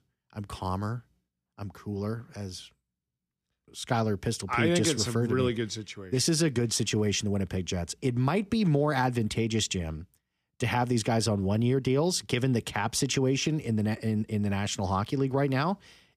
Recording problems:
none

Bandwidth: 15 kHz